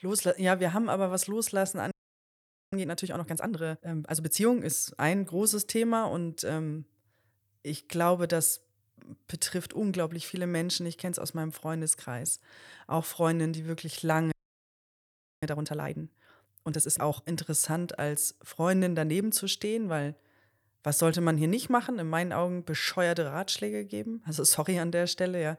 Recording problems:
audio freezing; at 2 s for 1 s and at 14 s for 1 s

